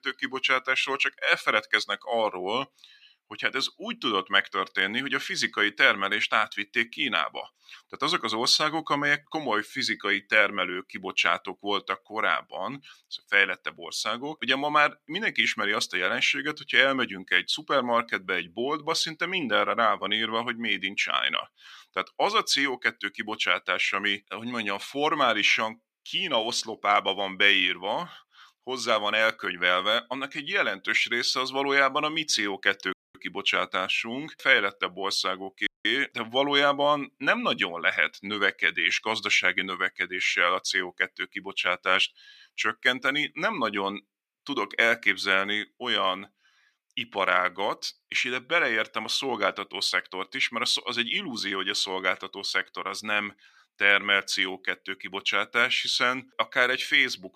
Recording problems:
thin; somewhat; fading below 1 kHz
audio cutting out; at 33 s and at 36 s

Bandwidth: 15 kHz